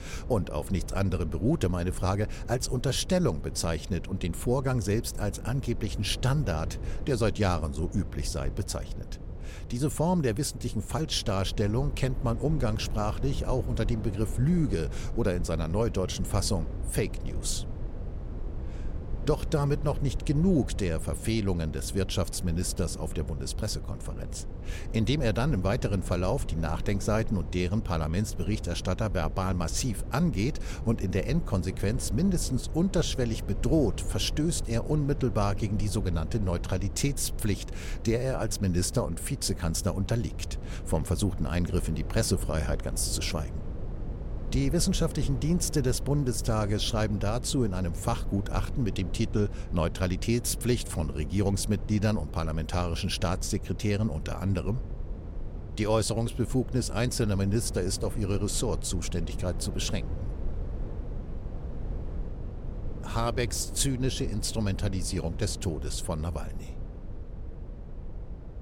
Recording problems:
low rumble; noticeable; throughout; 15 dB below the speech

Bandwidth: 16.5 kHz